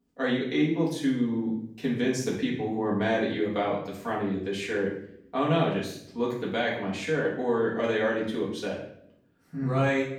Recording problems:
off-mic speech; far
room echo; noticeable; dies away in 0.6 s

